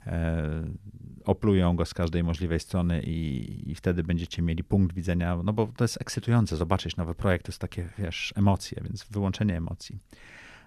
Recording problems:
none

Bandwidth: 13.5 kHz